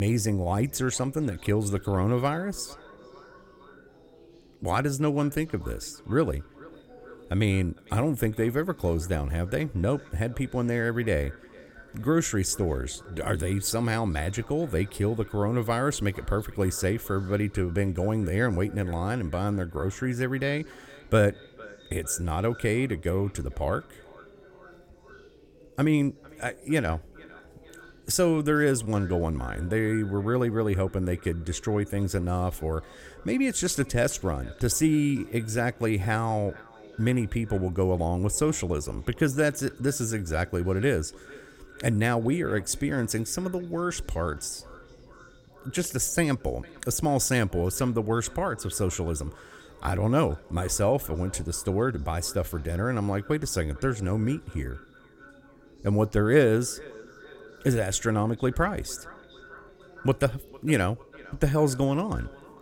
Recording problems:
echo of what is said; faint; throughout; 450 ms later, 25 dB below the speech
background chatter; faint; throughout; 3 voices, 30 dB below the speech
abrupt cut into speech; at the start

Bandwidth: 16.5 kHz